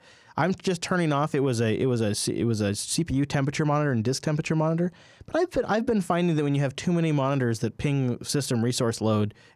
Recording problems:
none

